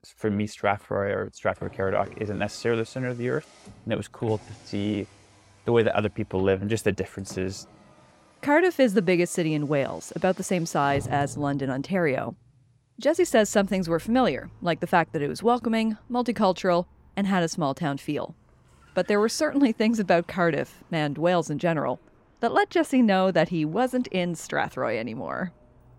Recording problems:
traffic noise; faint; throughout; 25 dB below the speech

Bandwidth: 16 kHz